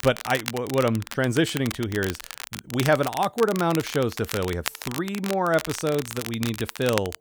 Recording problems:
crackle, like an old record; loud; 9 dB below the speech

